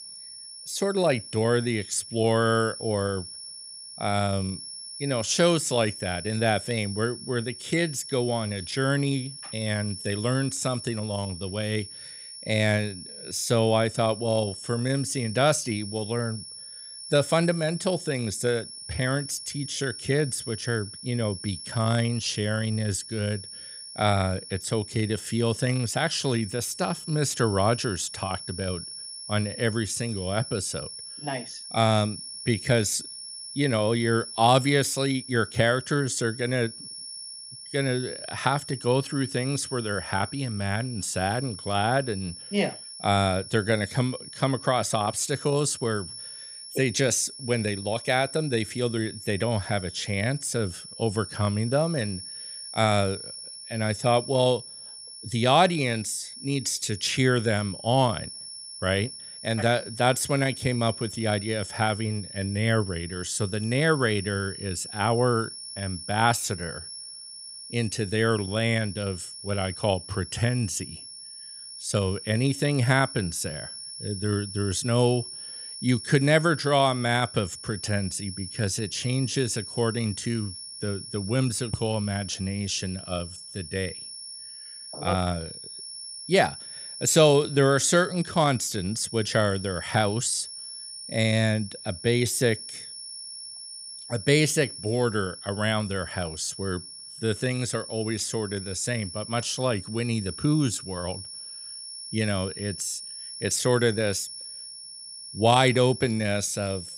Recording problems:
high-pitched whine; noticeable; throughout; 5.5 kHz, 10 dB below the speech

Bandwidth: 15.5 kHz